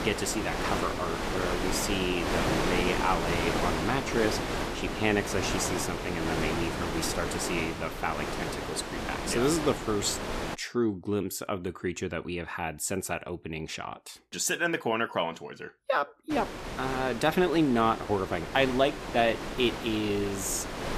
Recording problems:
wind noise on the microphone; heavy; until 11 s and from 16 s on; 3 dB below the speech

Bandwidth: 14.5 kHz